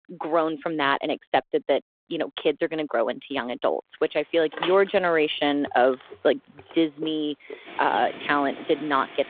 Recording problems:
phone-call audio
traffic noise; noticeable; from 4 s on; 15 dB below the speech

